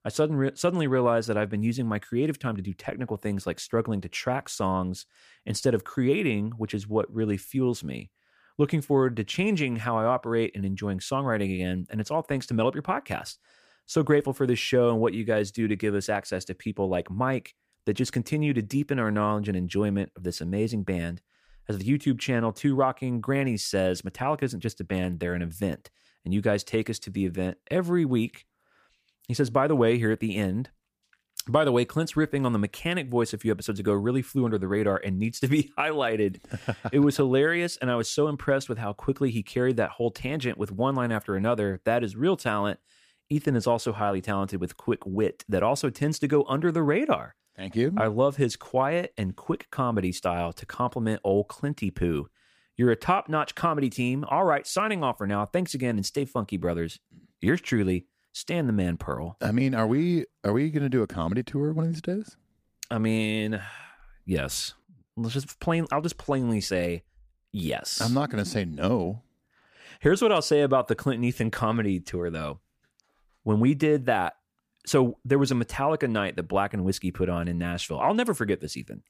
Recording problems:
none

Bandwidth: 15 kHz